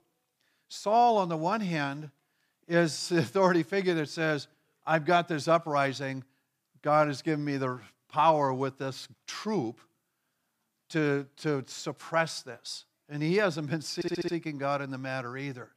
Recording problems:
audio stuttering; at 14 s

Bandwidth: 15 kHz